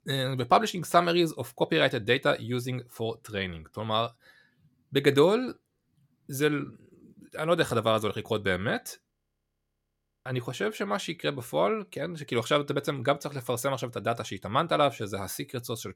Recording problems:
audio freezing; at 9 s for 1 s

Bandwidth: 17 kHz